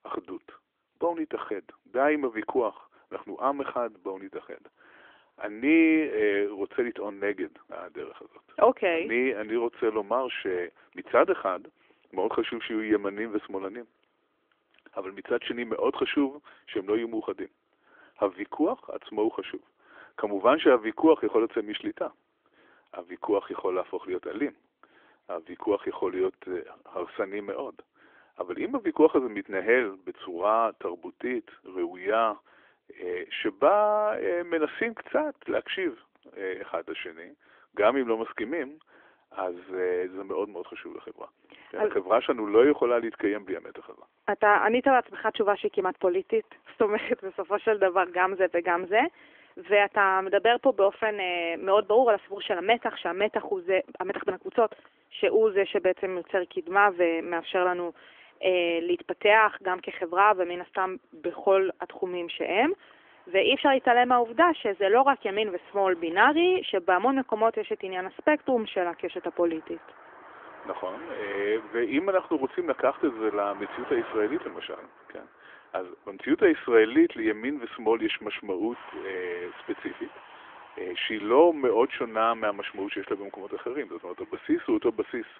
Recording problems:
phone-call audio; nothing above 3.5 kHz
traffic noise; faint; throughout; 20 dB below the speech

